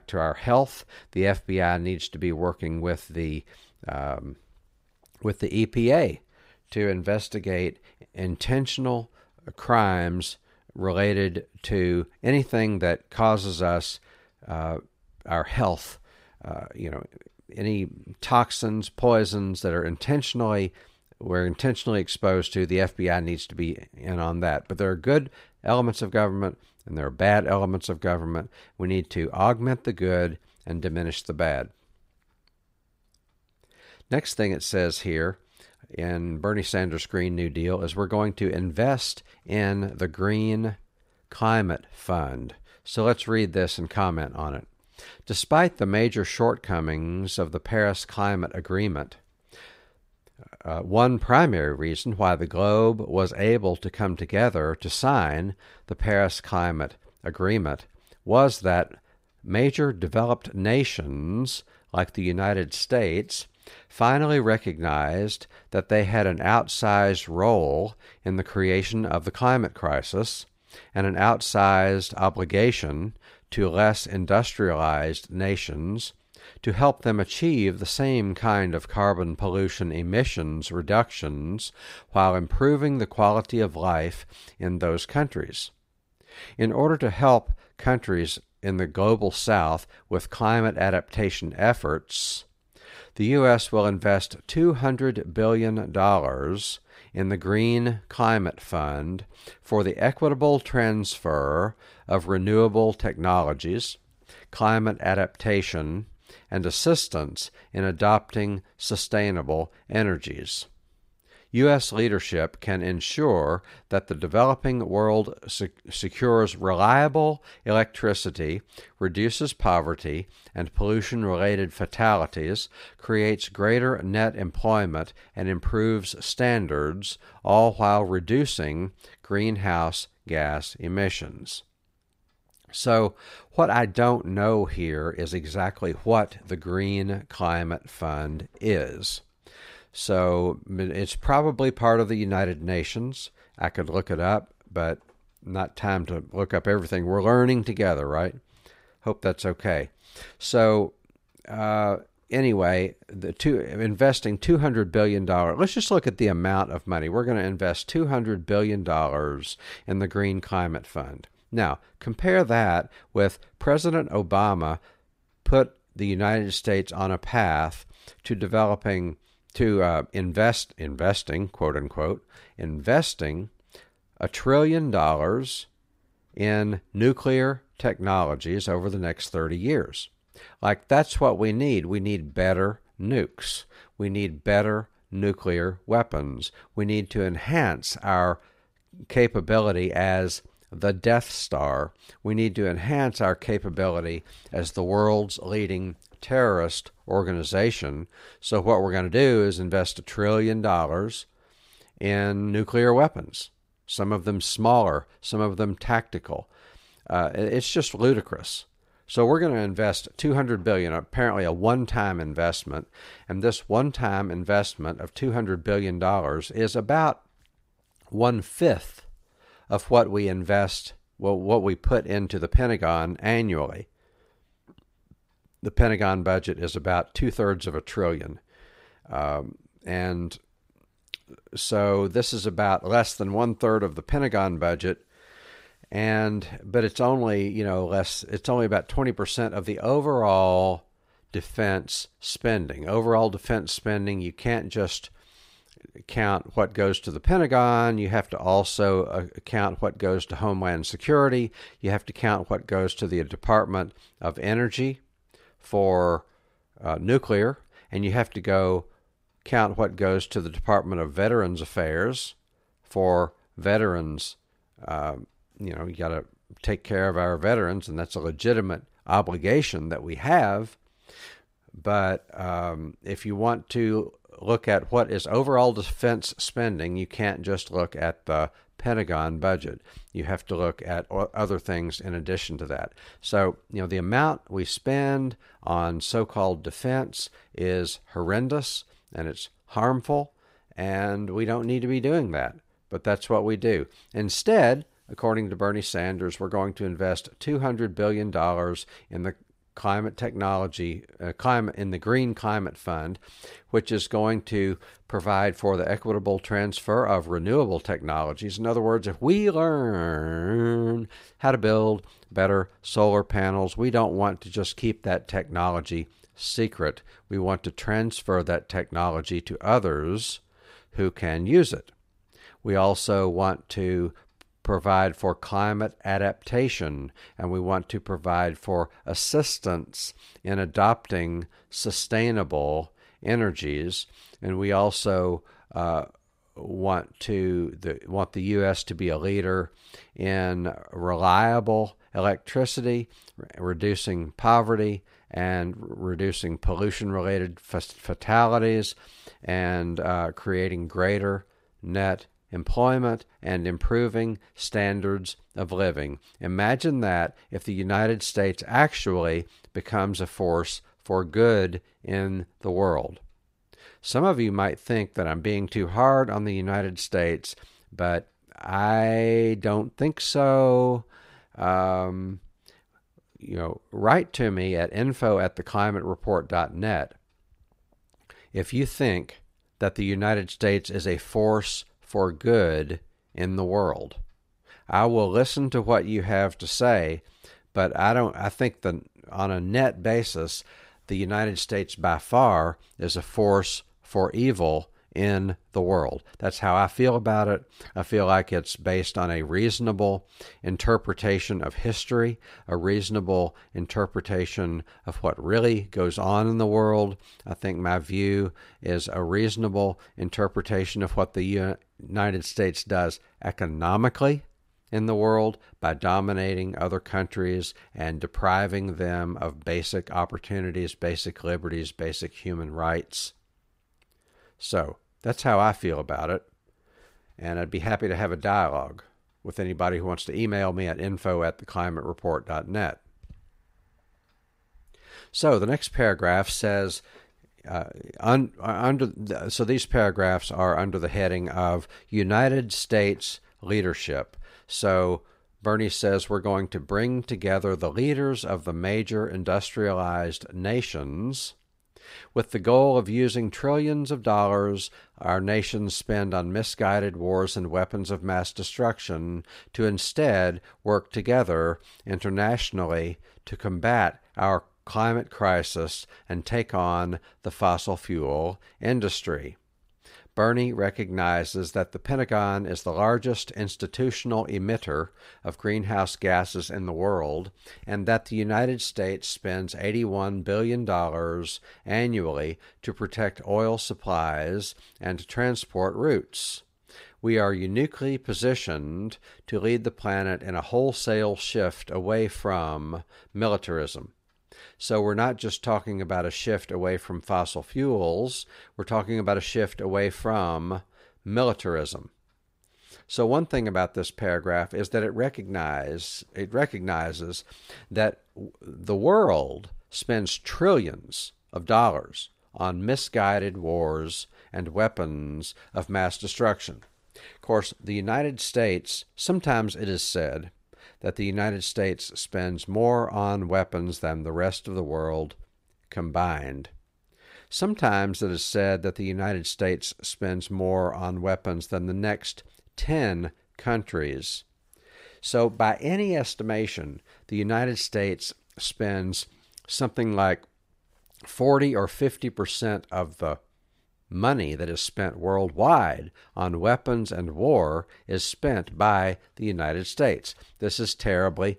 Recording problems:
none

